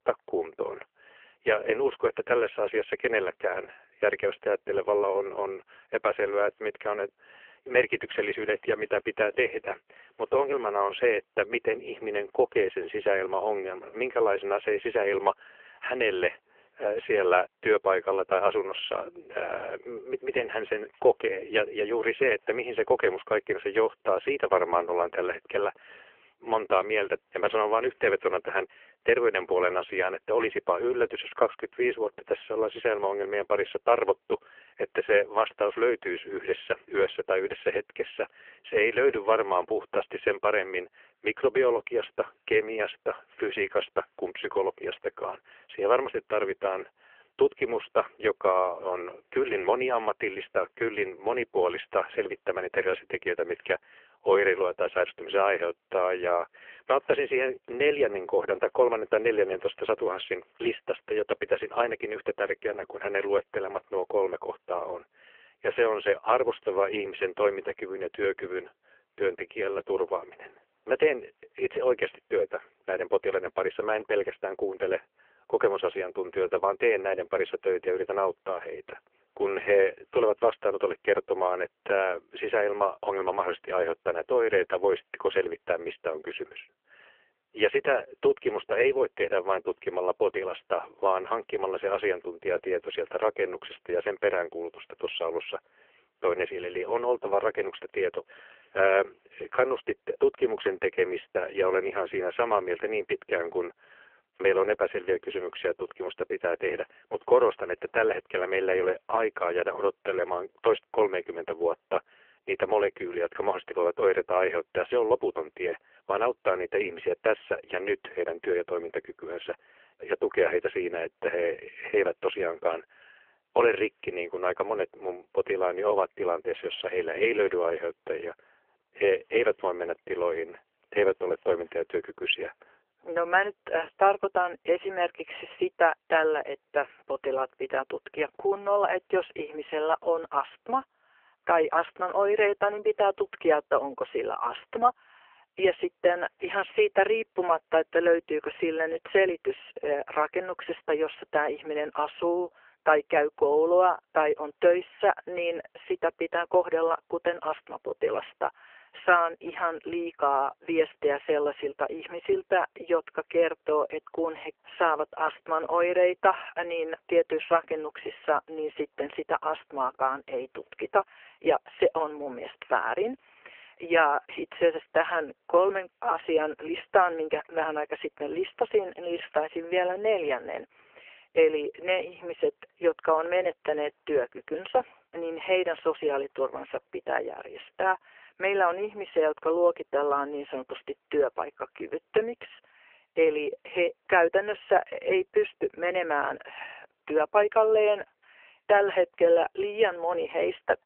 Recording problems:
phone-call audio; poor line; nothing above 3 kHz

